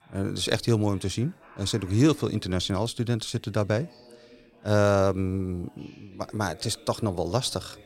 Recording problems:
voice in the background; faint; throughout; 25 dB below the speech

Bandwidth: 16 kHz